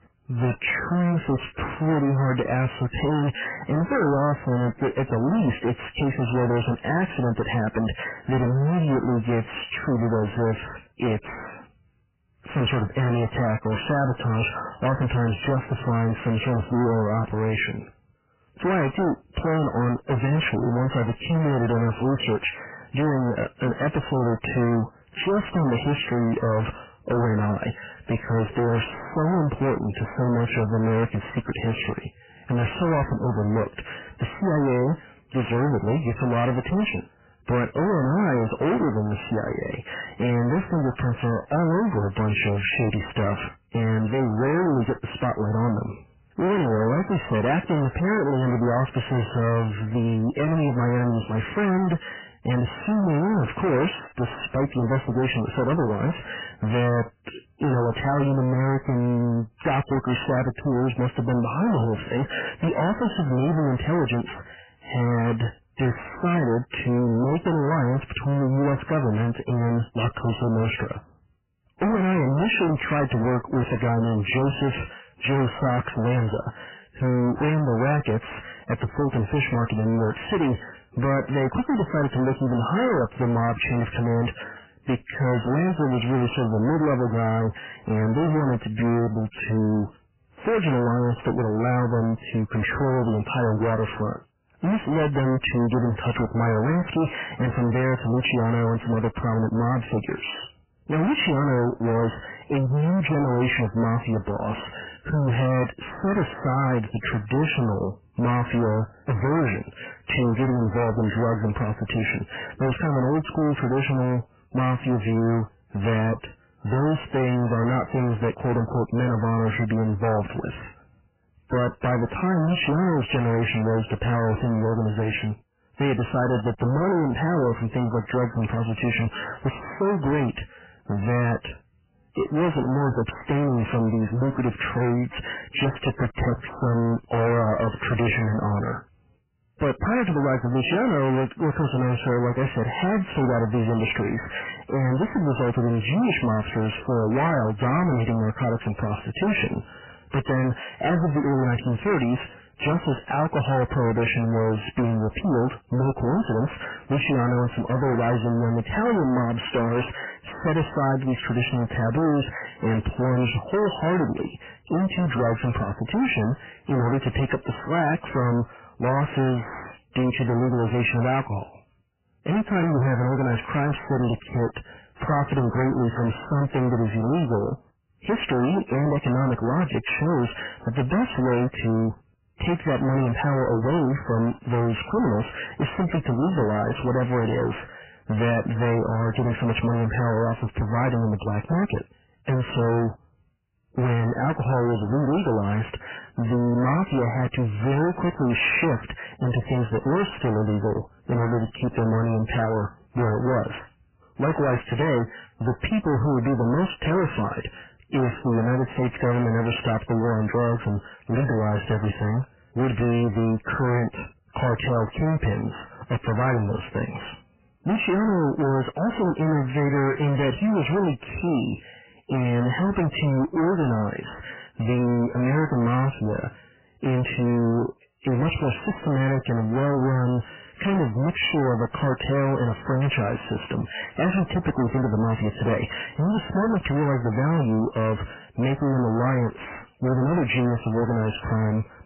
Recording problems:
distortion; heavy; 31% of the sound clipped
garbled, watery; badly; nothing above 3 kHz

